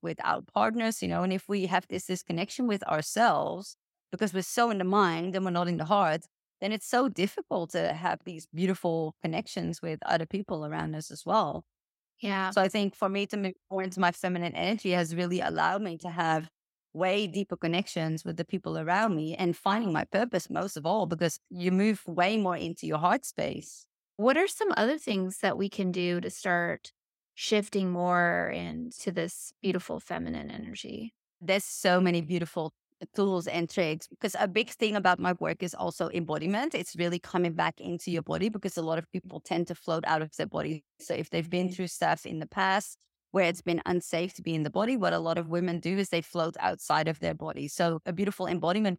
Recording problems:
none

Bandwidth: 16 kHz